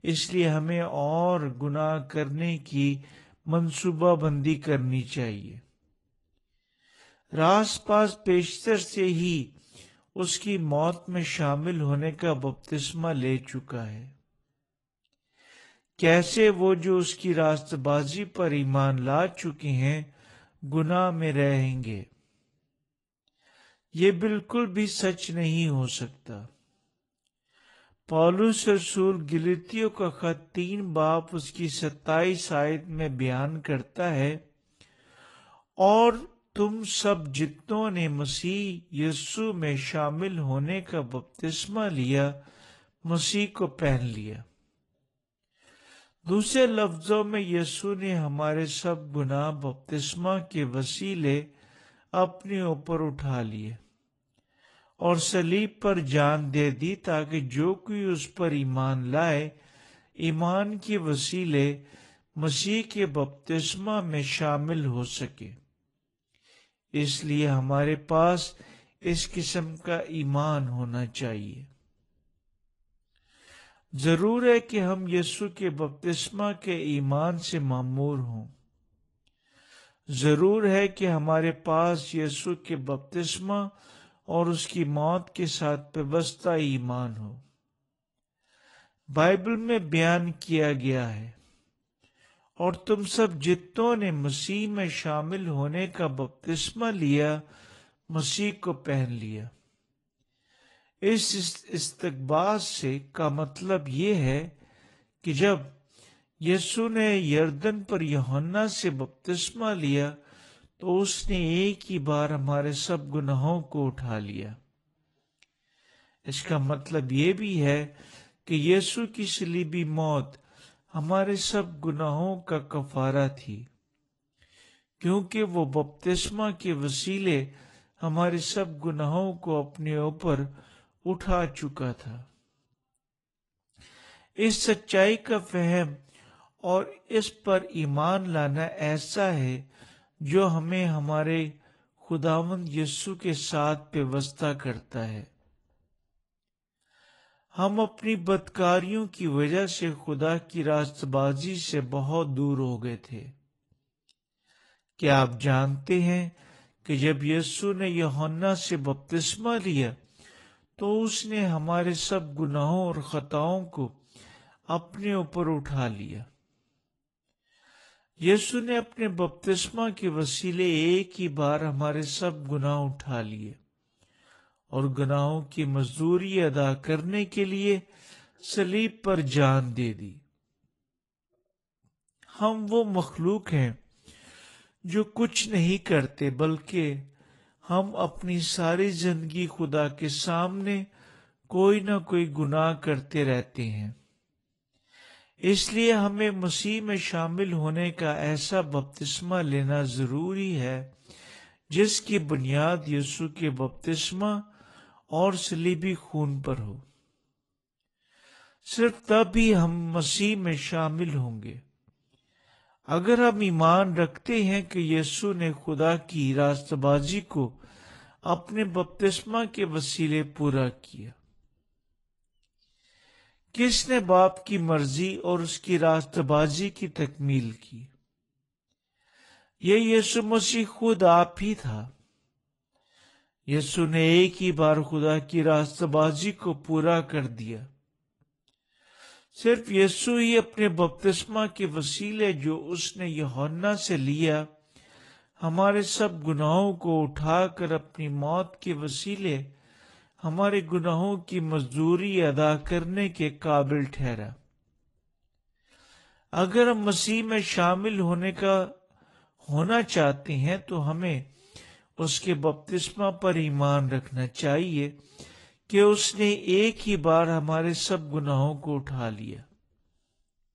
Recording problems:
wrong speed, natural pitch; too slow; 0.6 times normal speed
garbled, watery; slightly

